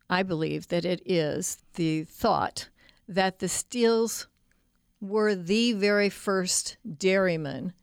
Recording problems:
none

